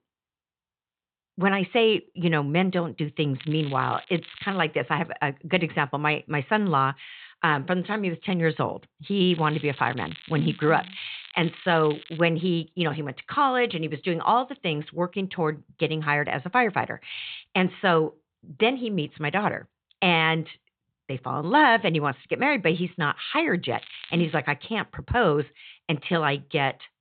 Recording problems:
high frequencies cut off; severe; nothing above 4 kHz
crackling; noticeable; from 3.5 to 4.5 s, from 9.5 to 12 s and at 24 s; 20 dB below the speech

